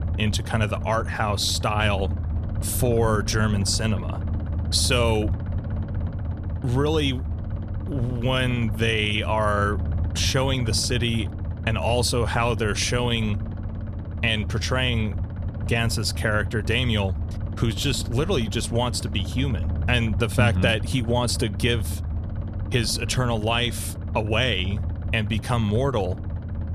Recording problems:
low rumble; noticeable; throughout; 15 dB below the speech

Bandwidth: 14 kHz